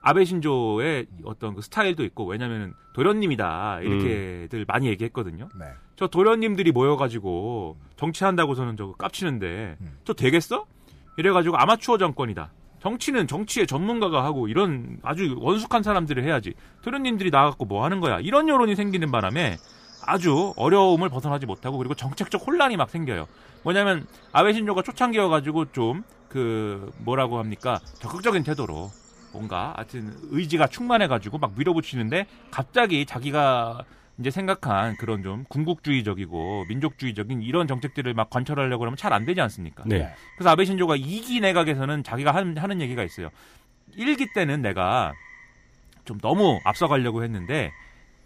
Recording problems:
animal sounds; faint; throughout; 25 dB below the speech

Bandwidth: 15 kHz